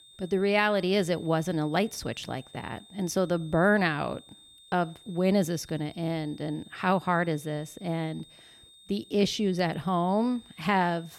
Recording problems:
high-pitched whine; faint; throughout; 3.5 kHz, 25 dB below the speech

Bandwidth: 17 kHz